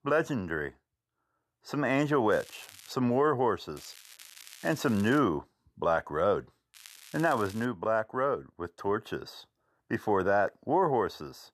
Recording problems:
crackling; noticeable; at 2.5 s, from 4 to 5 s and at 6.5 s; 20 dB below the speech

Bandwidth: 13.5 kHz